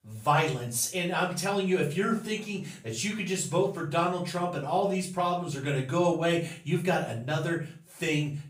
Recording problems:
off-mic speech; far
room echo; slight; dies away in 0.4 s

